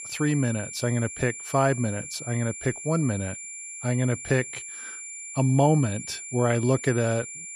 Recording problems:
high-pitched whine; loud; throughout; 7 kHz, 10 dB below the speech

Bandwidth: 15 kHz